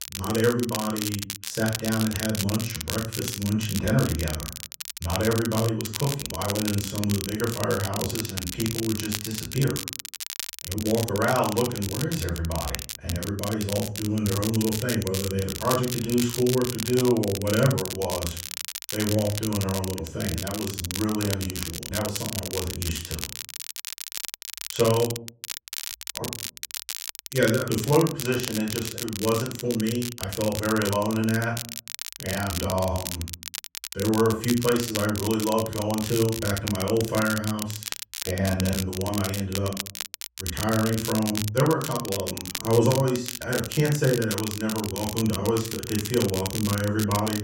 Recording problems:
off-mic speech; far
room echo; slight; dies away in 0.3 s
crackle, like an old record; loud; 6 dB below the speech

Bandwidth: 16 kHz